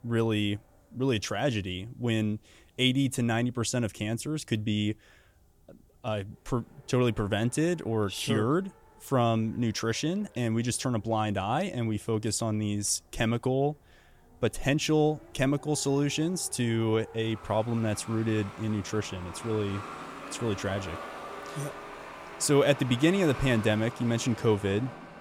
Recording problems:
traffic noise; noticeable; throughout; 15 dB below the speech

